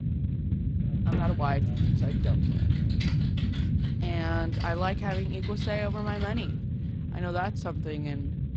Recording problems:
garbled, watery; slightly
low rumble; loud; throughout; 7 dB below the speech
electrical hum; faint; throughout; 50 Hz, 20 dB below the speech
keyboard typing; noticeable; from 1 to 6.5 s; peak 4 dB below the speech

